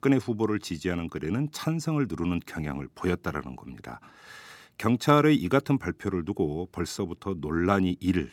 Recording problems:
none

